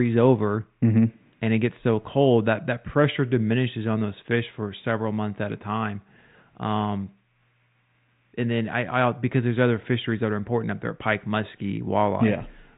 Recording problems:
high frequencies cut off; severe; nothing above 4 kHz
garbled, watery; slightly
muffled; very slightly; fading above 2 kHz
abrupt cut into speech; at the start

